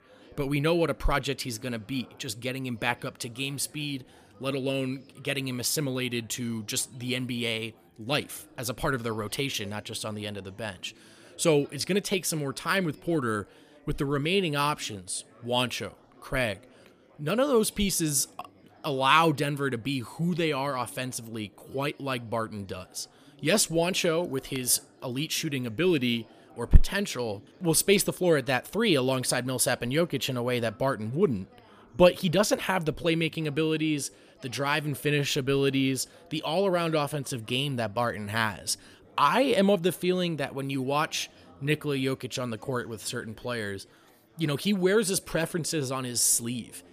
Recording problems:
chatter from many people; faint; throughout; 25 dB below the speech

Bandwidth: 15 kHz